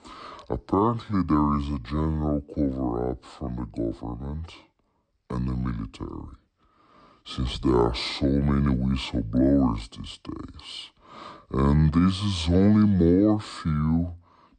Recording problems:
wrong speed and pitch; too slow and too low; 0.7 times normal speed

